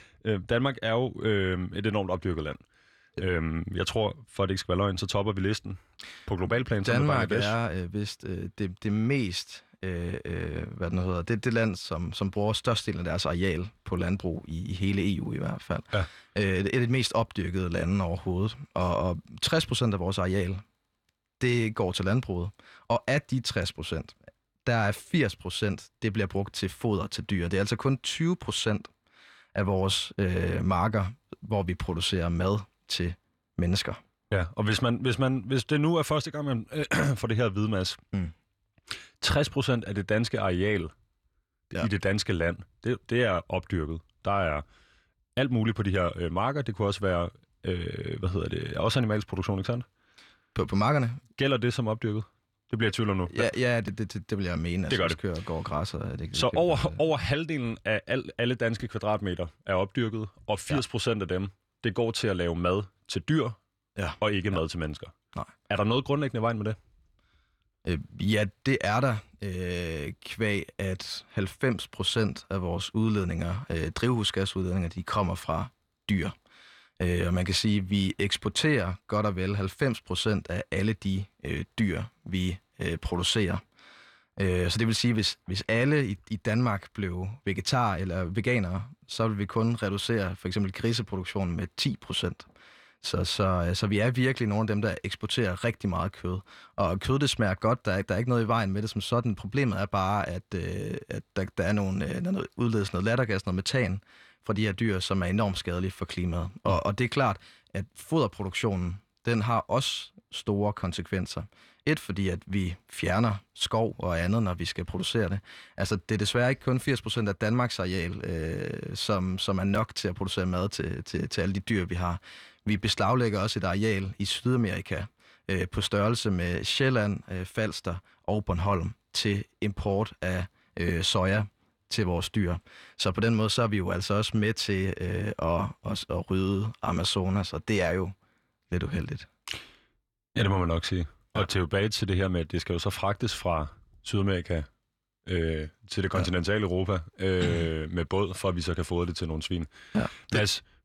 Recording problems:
none

